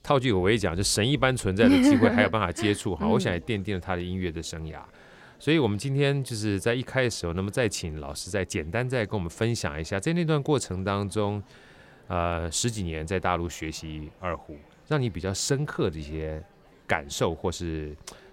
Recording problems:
chatter from many people; faint; throughout; 30 dB below the speech

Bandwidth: 16 kHz